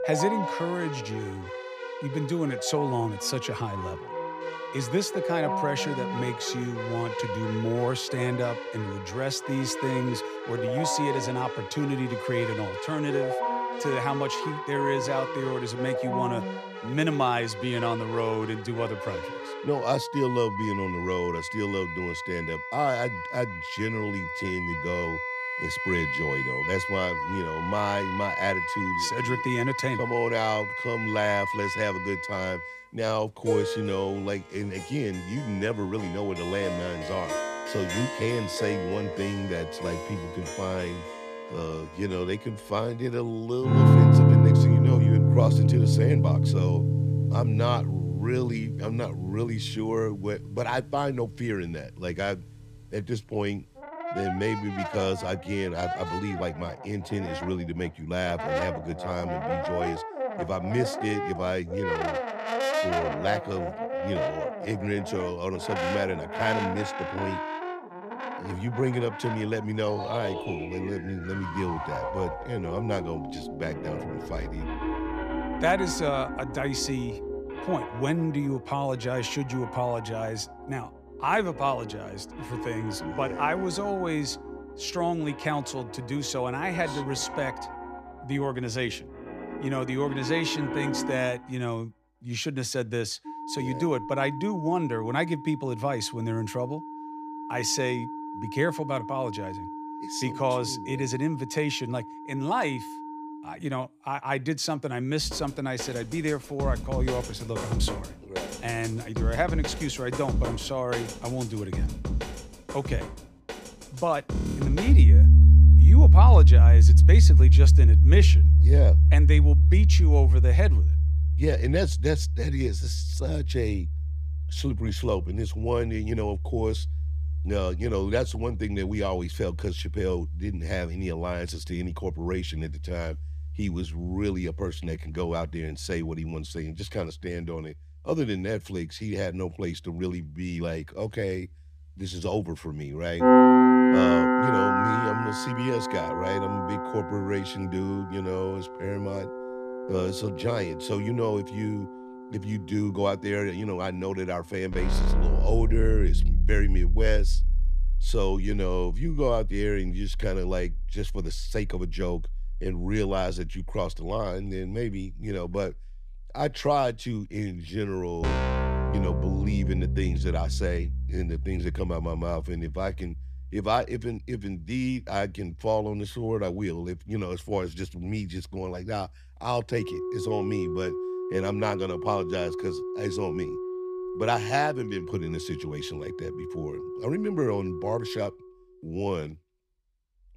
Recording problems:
background music; very loud; throughout; 5 dB above the speech

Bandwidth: 15 kHz